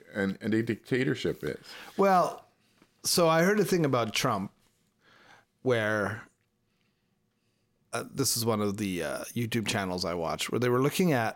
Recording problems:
none

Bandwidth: 16.5 kHz